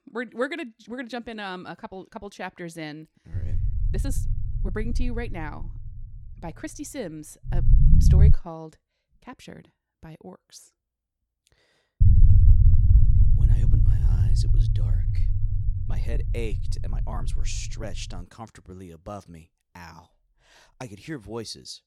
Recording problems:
low rumble; loud; from 3.5 to 8.5 s and from 12 to 18 s; 2 dB below the speech
uneven, jittery; strongly; from 1 to 21 s

